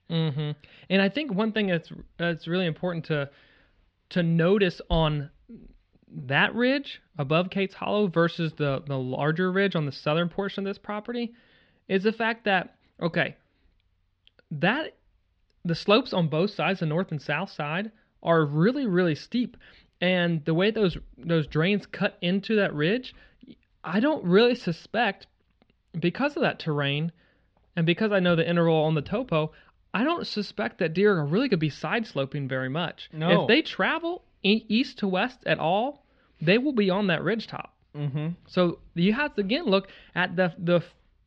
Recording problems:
muffled; very slightly; fading above 4 kHz

